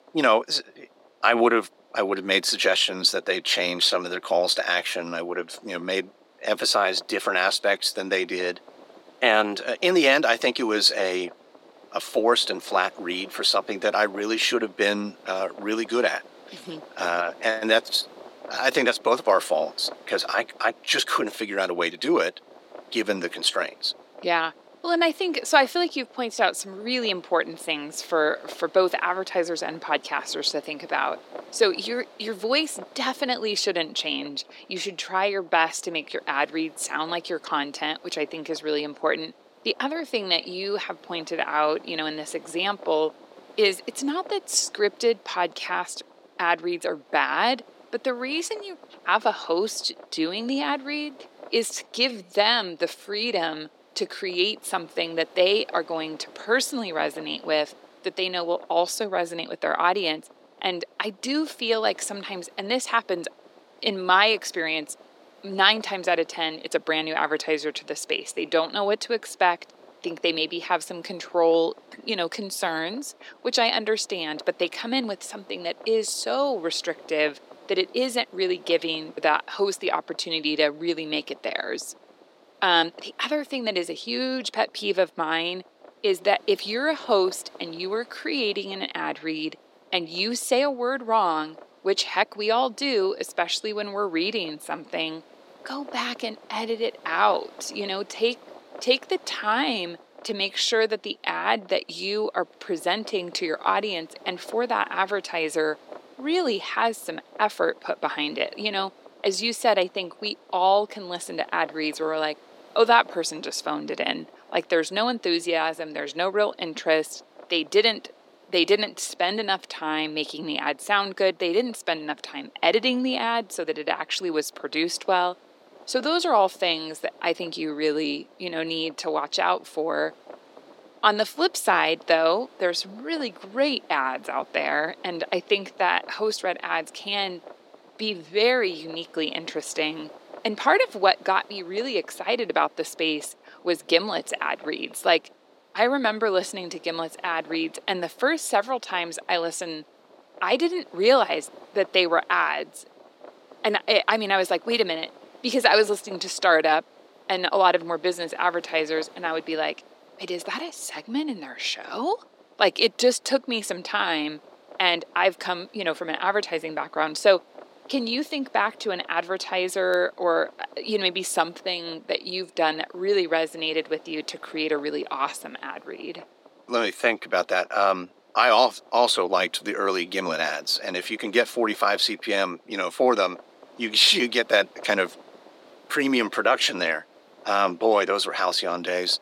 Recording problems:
thin; somewhat; fading below 300 Hz
wind noise on the microphone; occasional gusts; 25 dB below the speech

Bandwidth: 16.5 kHz